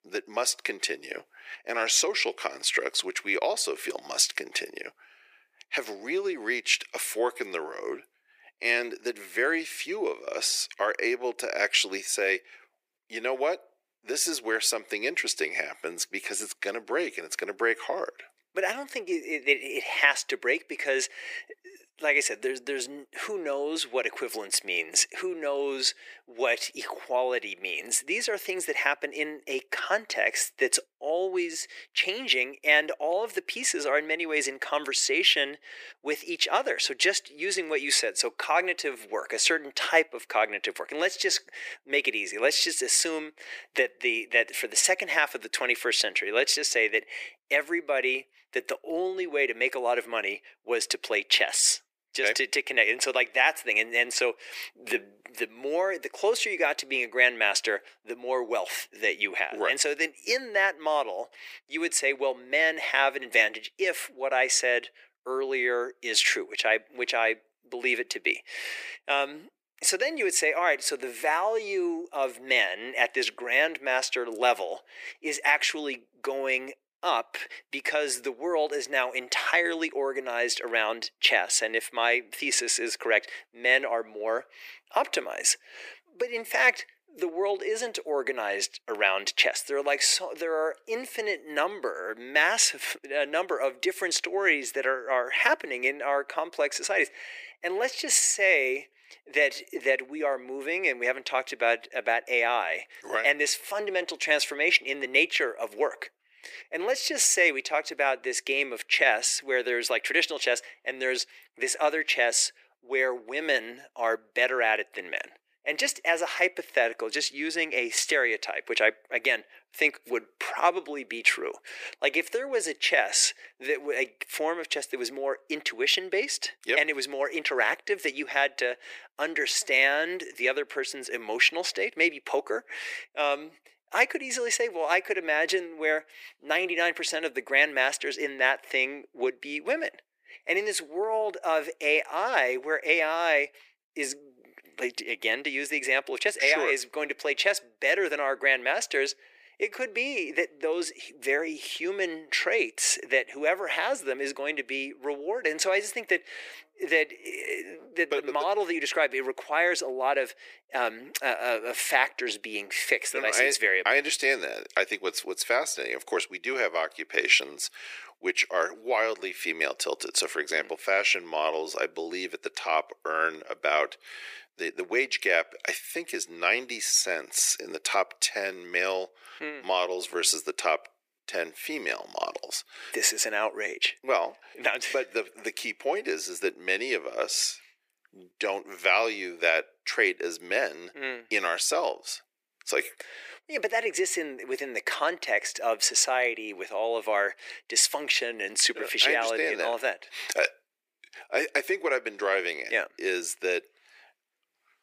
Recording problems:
thin; very; fading below 350 Hz

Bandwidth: 15 kHz